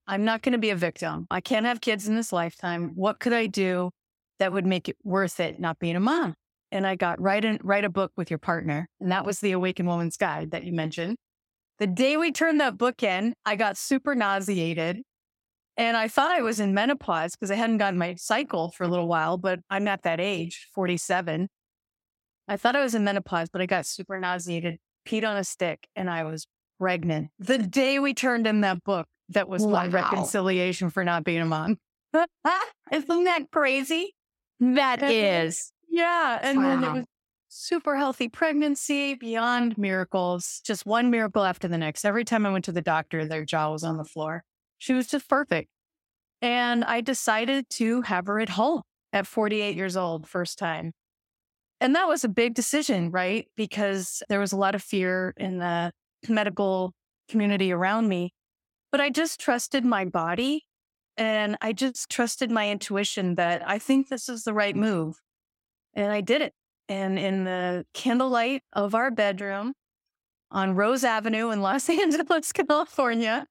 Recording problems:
none

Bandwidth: 16.5 kHz